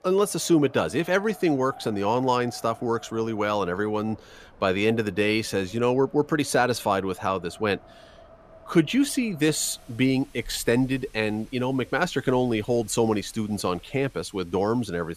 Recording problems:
wind in the background; faint; throughout; 25 dB below the speech

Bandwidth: 14.5 kHz